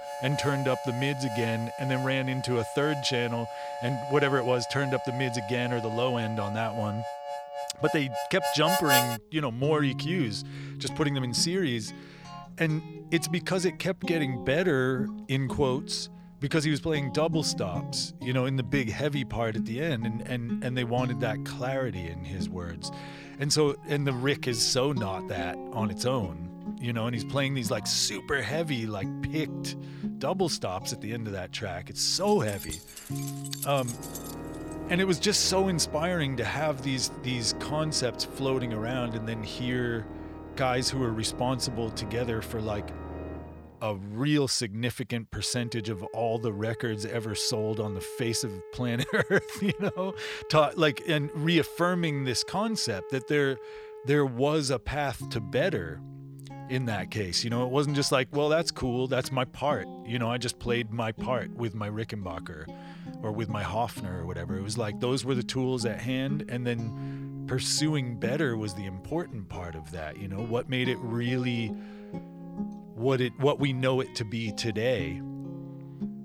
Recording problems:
background music; loud; throughout; 9 dB below the speech
jangling keys; noticeable; from 32 to 35 s; peak 8 dB below the speech

